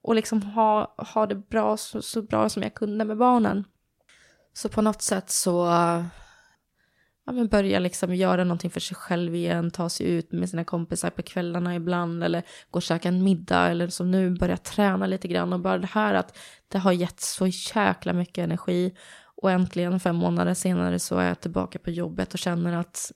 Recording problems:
none

